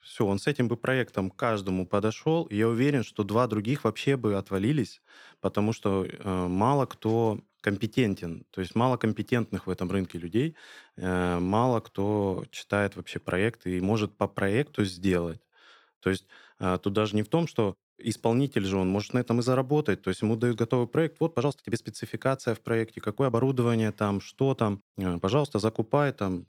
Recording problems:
uneven, jittery; strongly; from 1 to 26 s

